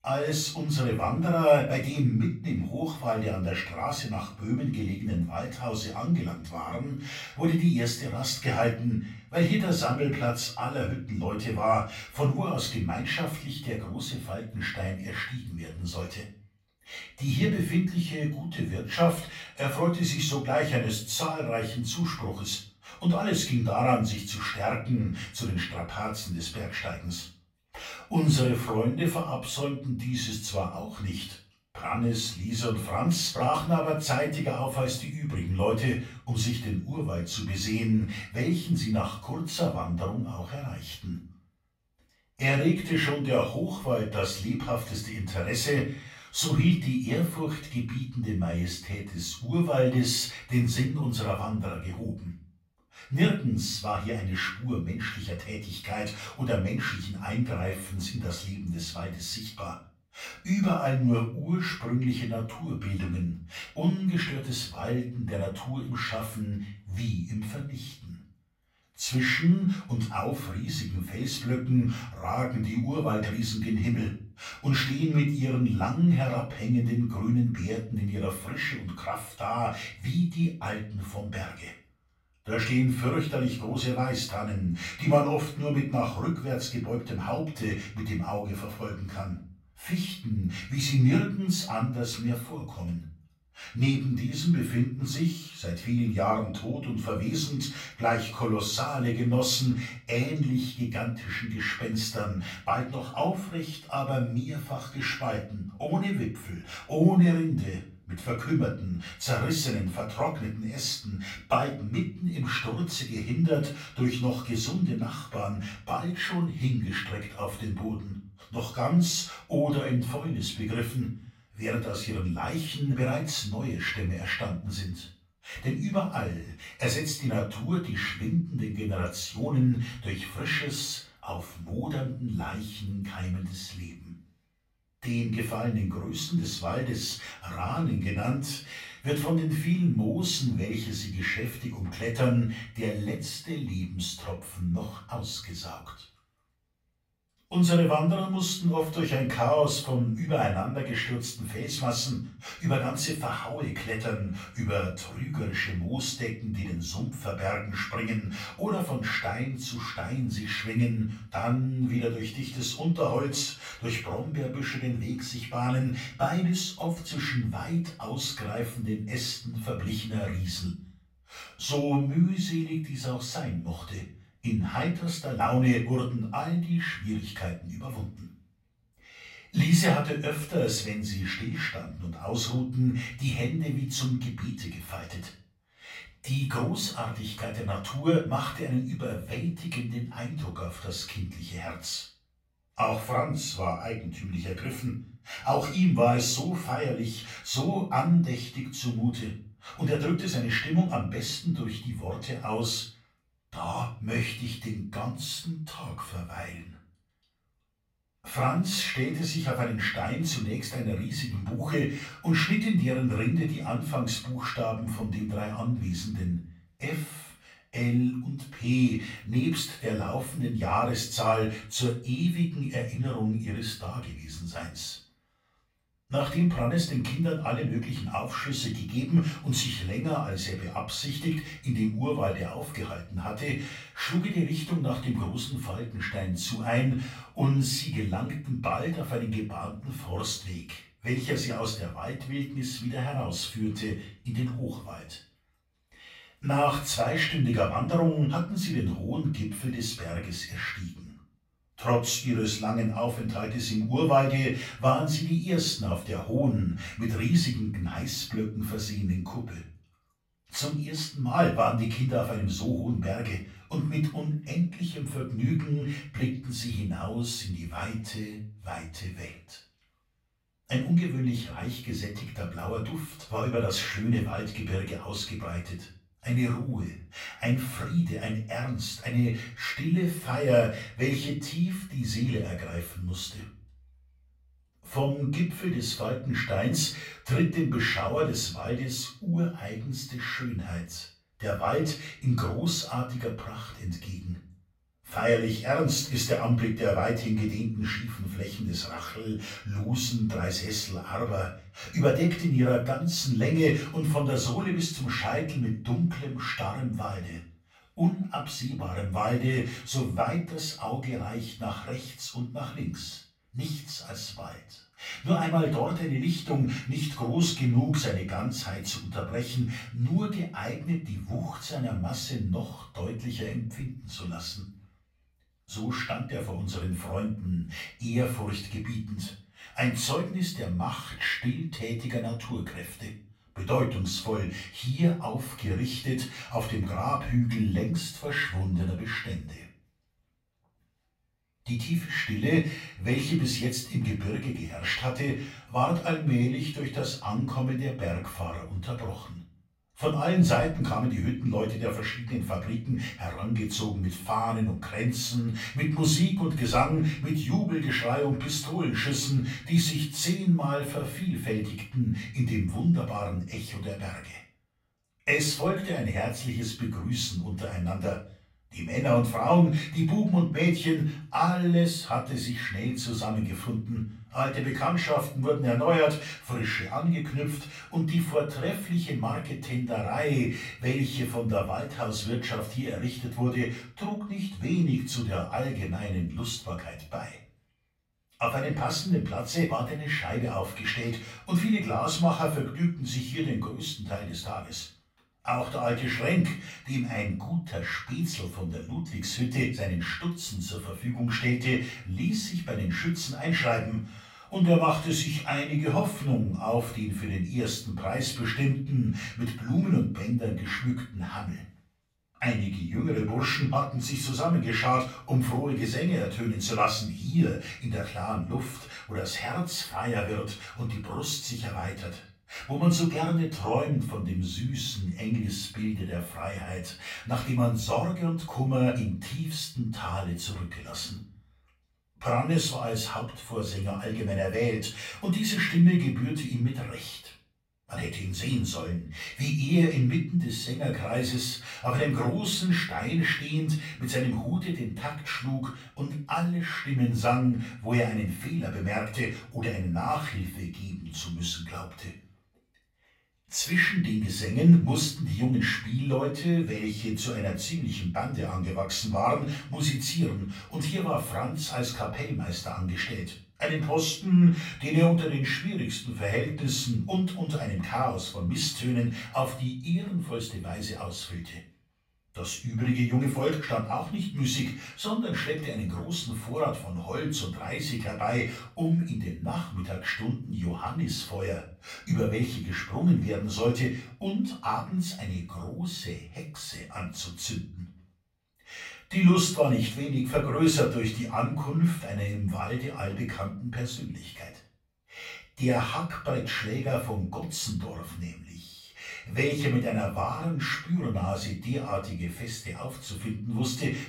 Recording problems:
off-mic speech; far
room echo; slight; dies away in 0.4 s

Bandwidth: 16 kHz